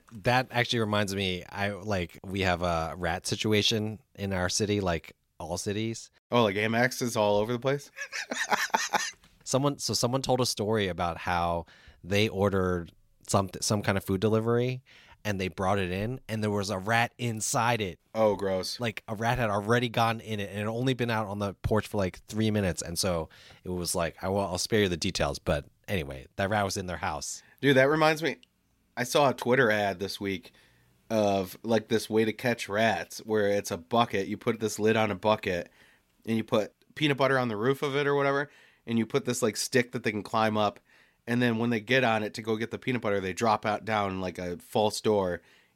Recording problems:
none

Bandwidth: 16 kHz